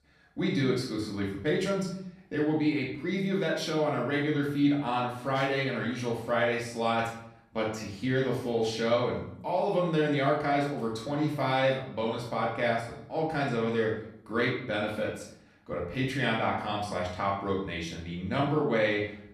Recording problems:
off-mic speech; far
room echo; noticeable; dies away in 0.6 s

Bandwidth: 14 kHz